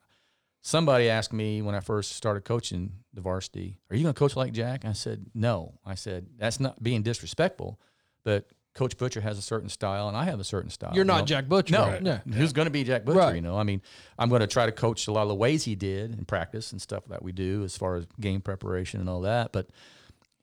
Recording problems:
none

